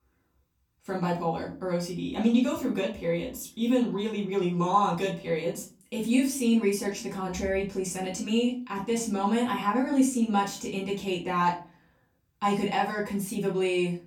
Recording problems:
off-mic speech; far
room echo; slight; dies away in 0.3 s

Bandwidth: 18.5 kHz